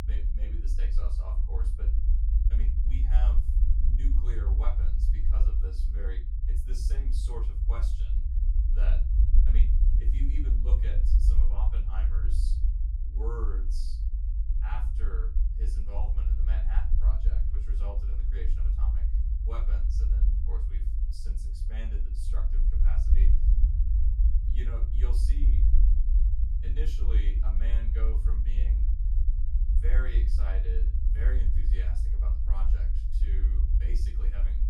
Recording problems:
off-mic speech; far
room echo; slight; dies away in 0.3 s
low rumble; loud; throughout; 3 dB below the speech

